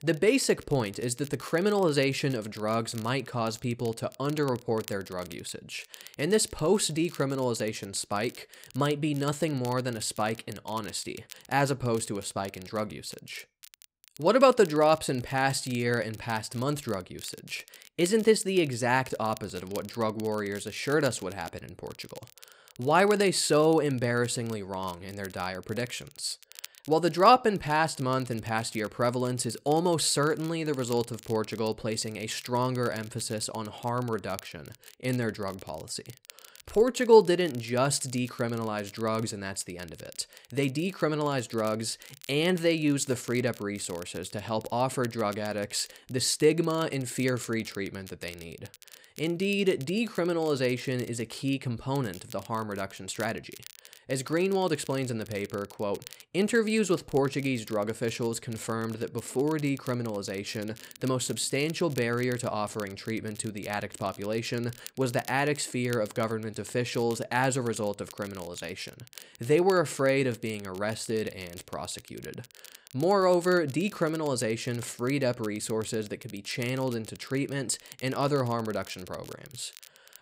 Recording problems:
crackle, like an old record; faint; 20 dB below the speech

